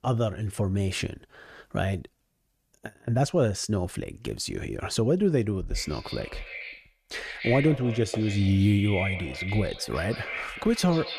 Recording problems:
echo of what is said; strong; from 5.5 s on; 140 ms later, 9 dB below the speech

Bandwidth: 14.5 kHz